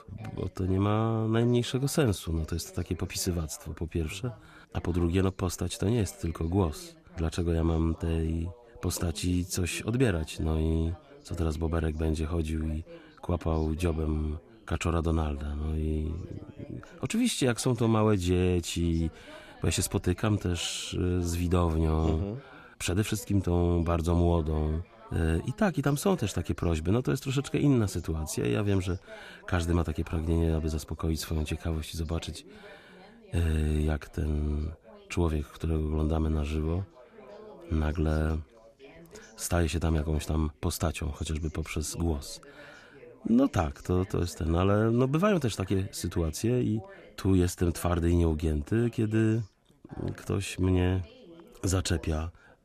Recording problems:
background chatter; faint; throughout; 3 voices, 25 dB below the speech

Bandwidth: 14.5 kHz